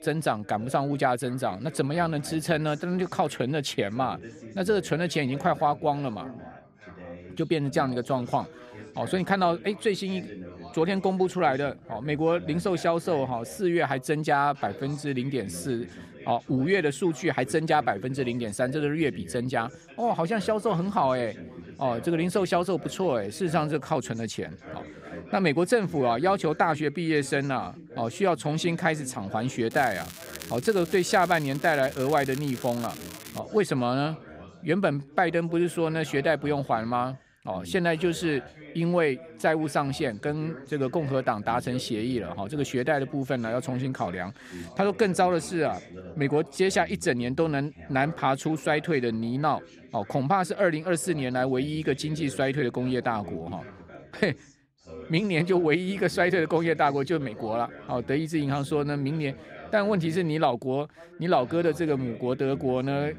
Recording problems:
background chatter; noticeable; throughout; 3 voices, 15 dB below the speech
crackling; noticeable; from 30 to 33 s; 15 dB below the speech

